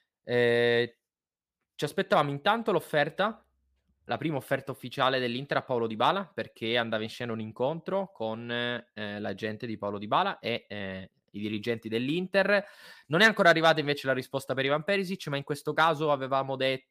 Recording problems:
none

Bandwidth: 15 kHz